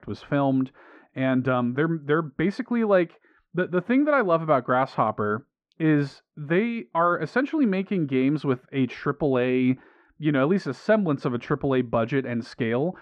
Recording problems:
muffled; very; fading above 1.5 kHz

